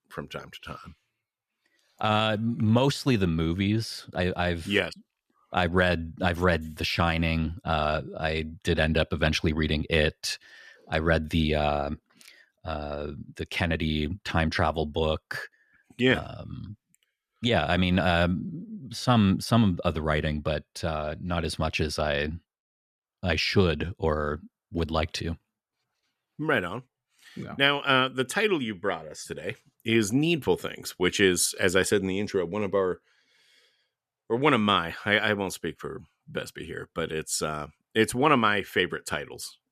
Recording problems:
none

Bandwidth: 14.5 kHz